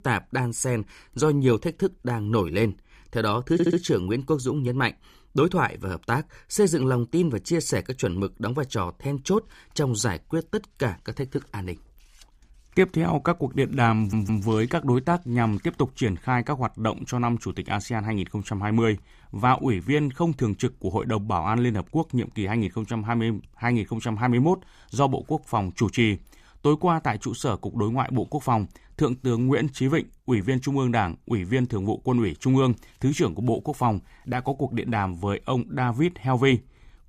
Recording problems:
audio stuttering; at 3.5 s and at 14 s

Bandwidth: 15 kHz